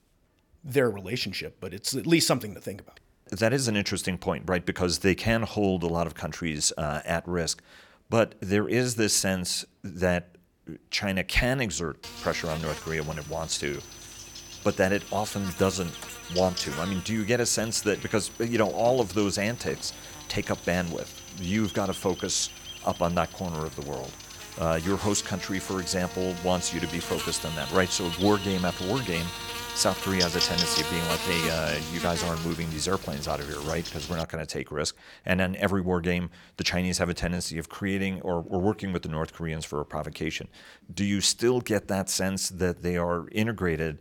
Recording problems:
electrical hum; loud; from 12 to 34 s; 50 Hz, 6 dB below the speech
high-pitched whine; noticeable; from 13 to 30 s; 6 kHz, 20 dB below the speech

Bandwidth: 18 kHz